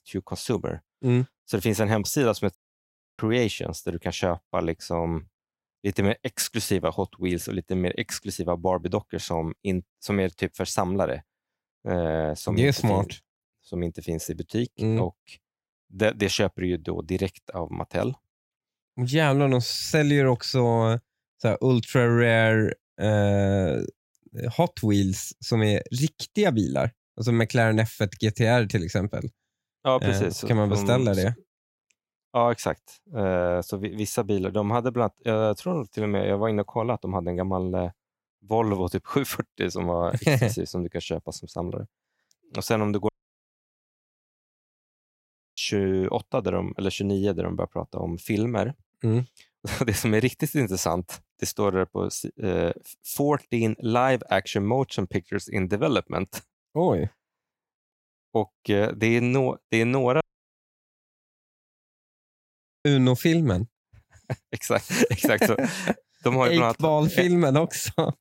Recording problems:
audio cutting out; at 2.5 s for 0.5 s, at 43 s for 2.5 s and at 1:00 for 2.5 s

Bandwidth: 16 kHz